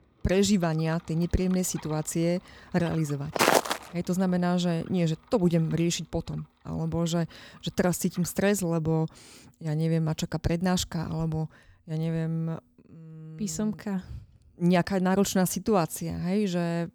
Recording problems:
traffic noise; faint; throughout; 25 dB below the speech
footsteps; loud; at 3.5 s; peak 6 dB above the speech

